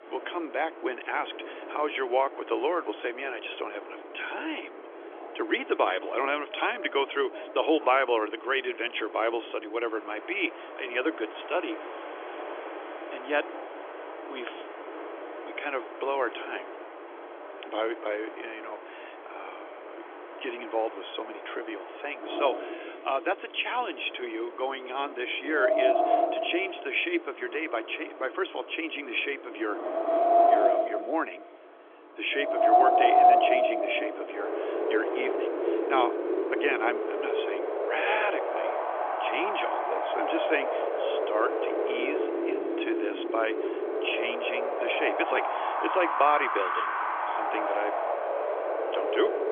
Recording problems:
phone-call audio; nothing above 3.5 kHz
wind in the background; very loud; throughout; 2 dB above the speech

